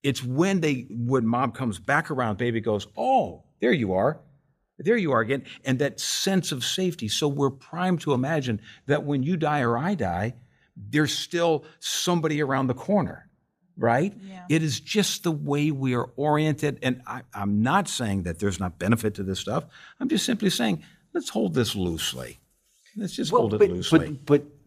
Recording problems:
none

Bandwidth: 14.5 kHz